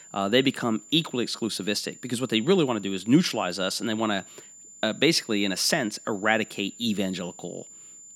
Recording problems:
high-pitched whine; noticeable; throughout; 7 kHz, 20 dB below the speech

